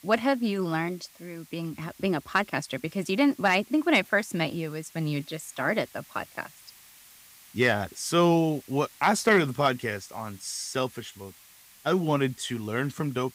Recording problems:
hiss; faint; throughout; 25 dB below the speech

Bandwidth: 15.5 kHz